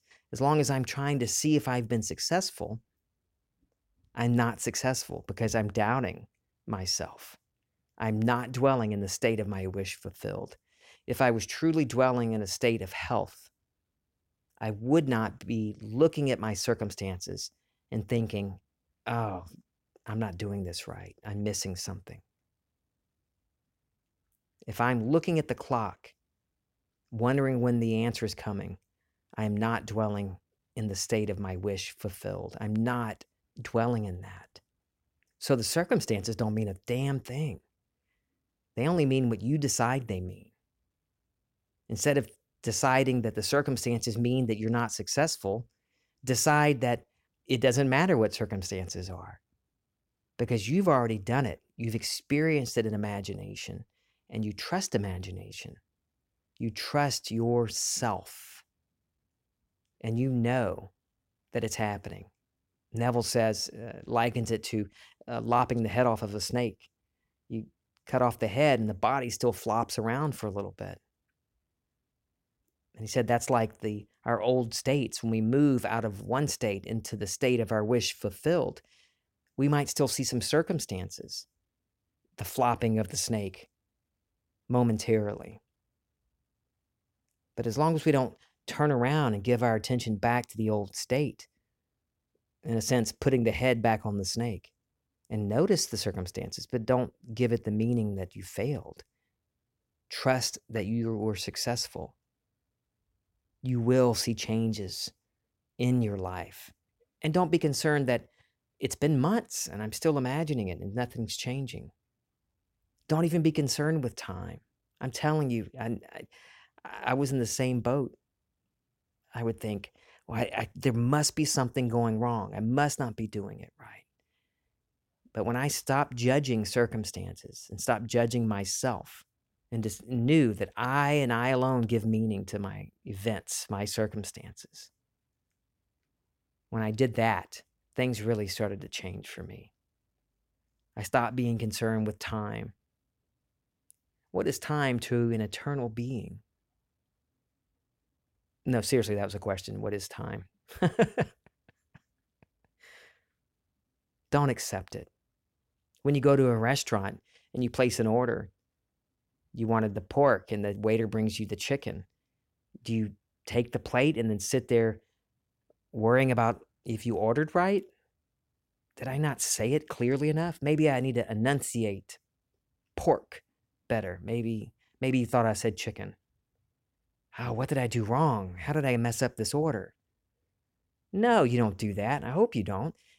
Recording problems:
none

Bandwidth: 16.5 kHz